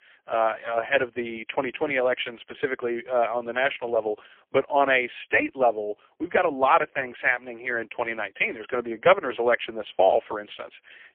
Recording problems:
phone-call audio; poor line; nothing above 3.5 kHz

